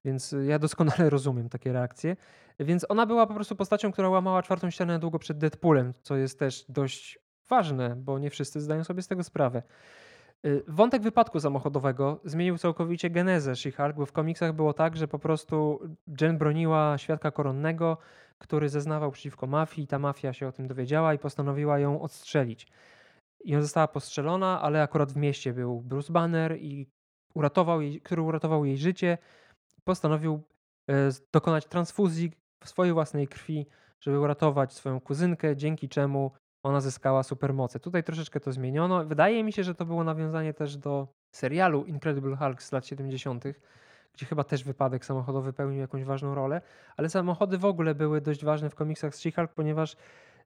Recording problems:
muffled; very; fading above 2.5 kHz

